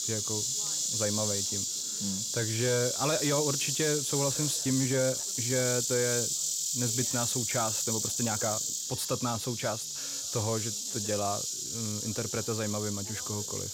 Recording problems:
animal sounds; very loud; throughout; 3 dB above the speech
background chatter; faint; throughout; 3 voices, 25 dB below the speech
uneven, jittery; strongly; from 4.5 to 11 s

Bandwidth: 16.5 kHz